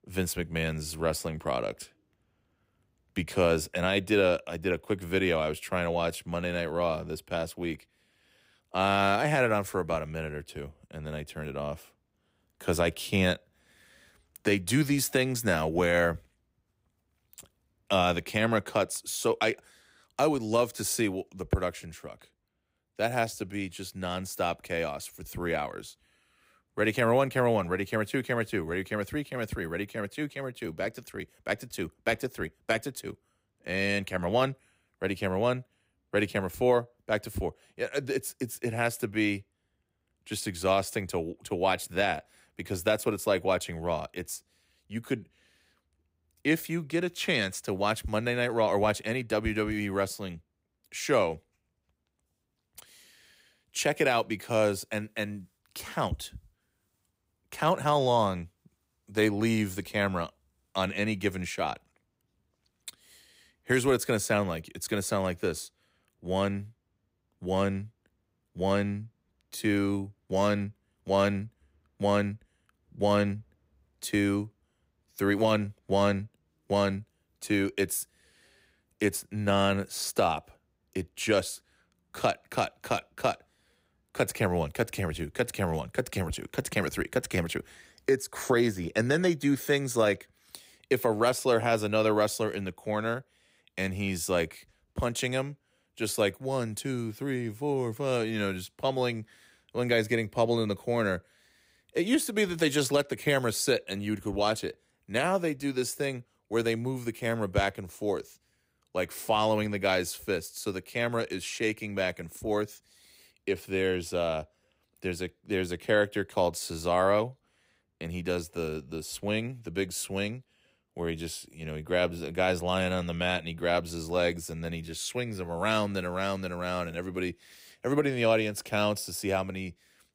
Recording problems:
none

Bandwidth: 15.5 kHz